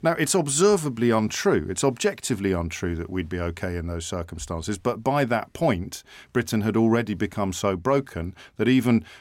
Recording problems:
none

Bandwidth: 16 kHz